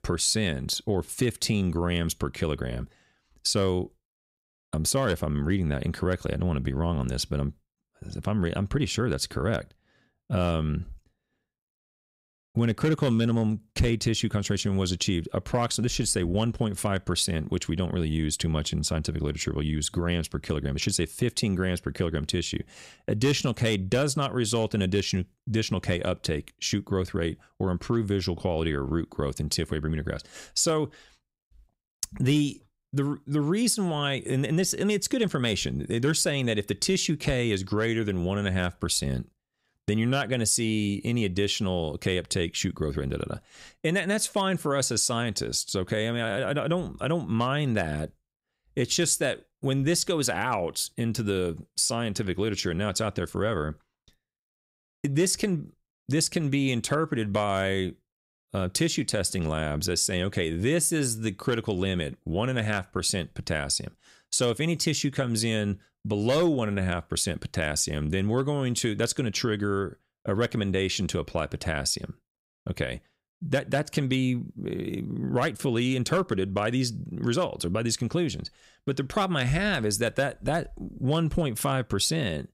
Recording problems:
none

